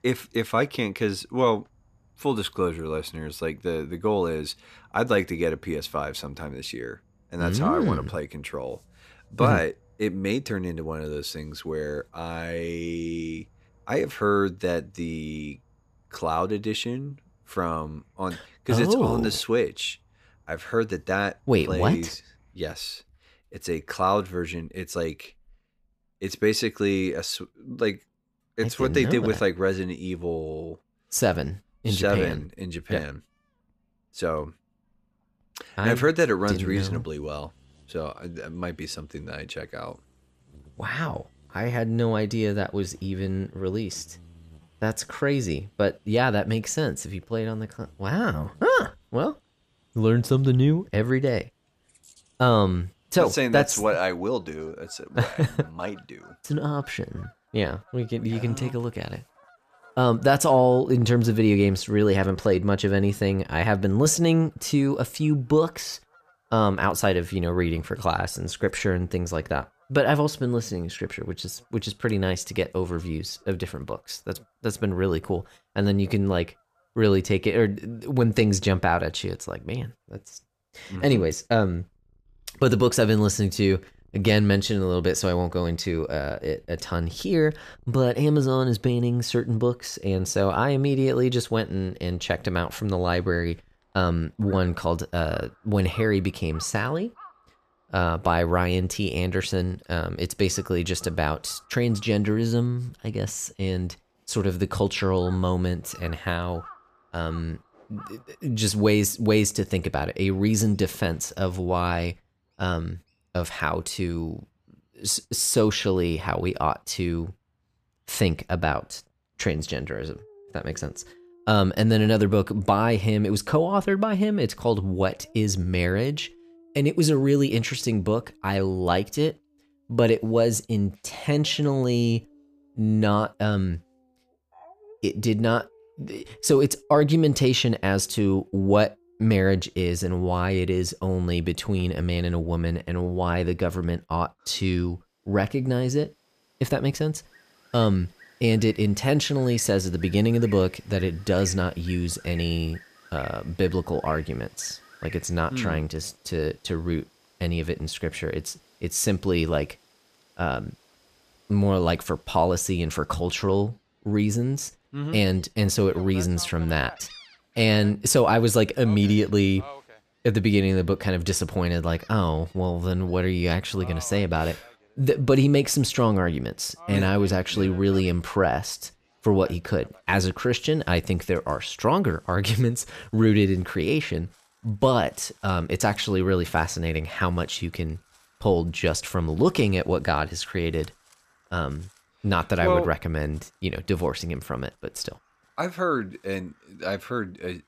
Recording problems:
animal sounds; faint; throughout; 30 dB below the speech

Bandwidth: 14.5 kHz